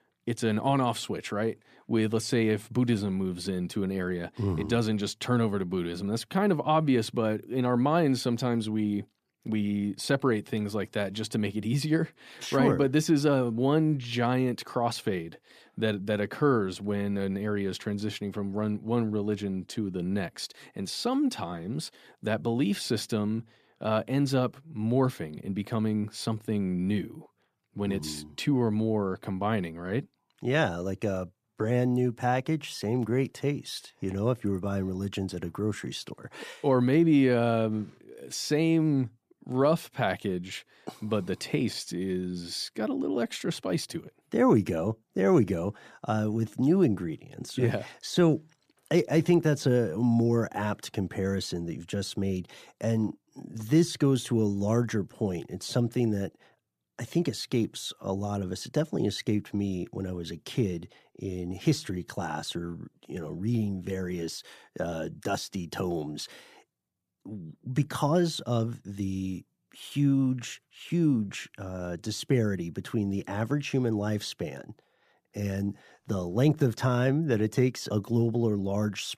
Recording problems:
none

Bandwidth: 14.5 kHz